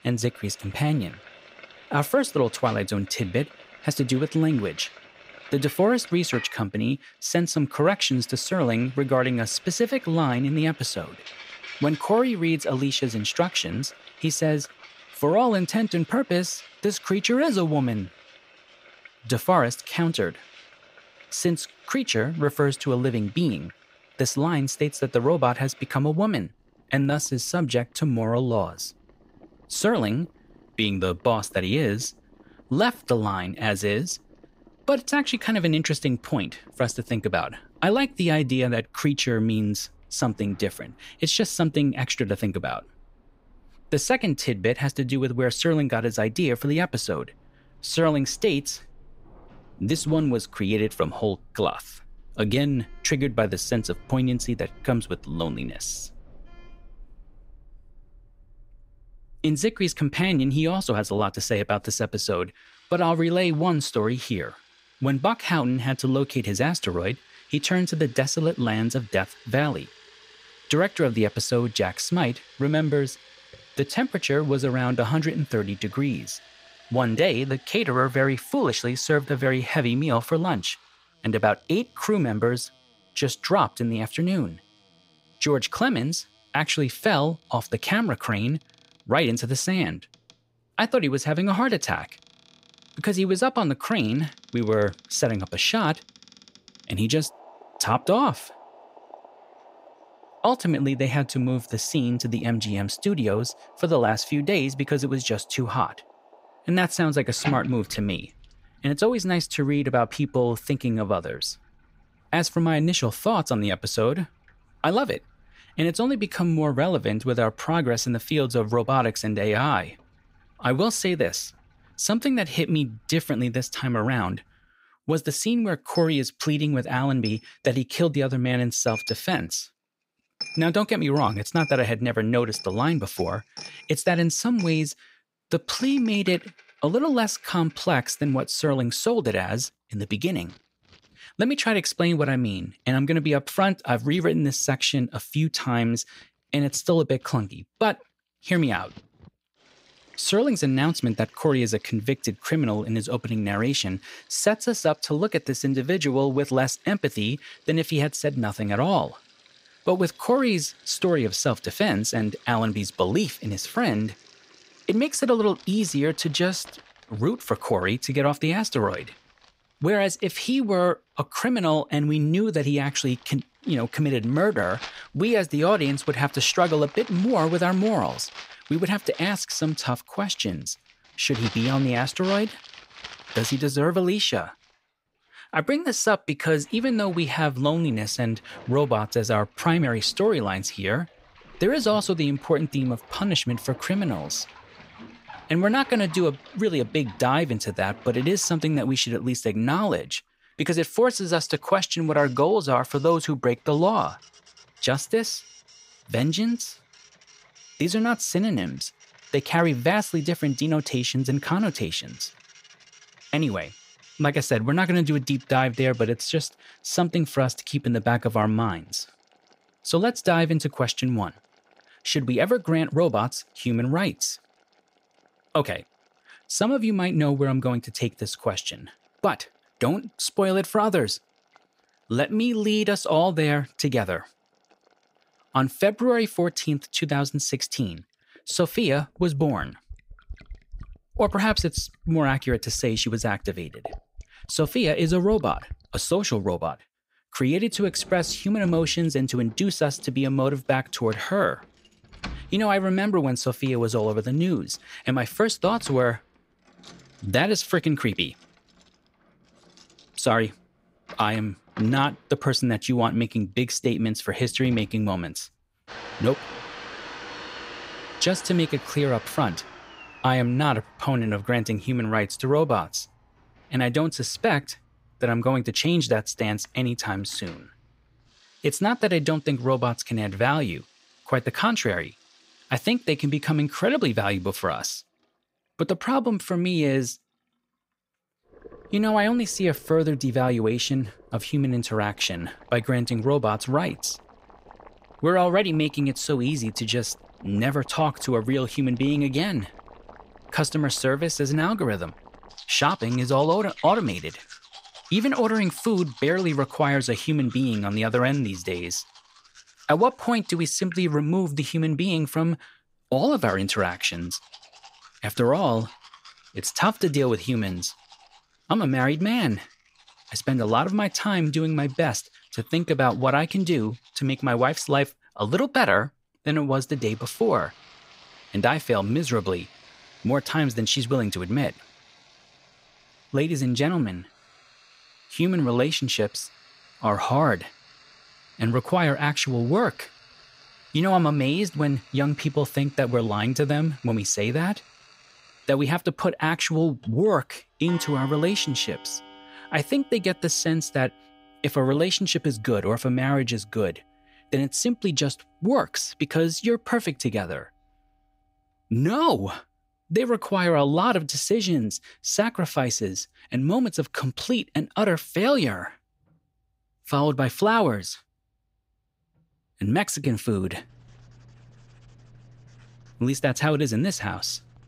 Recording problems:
household noises; faint; throughout; 20 dB below the speech

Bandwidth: 15.5 kHz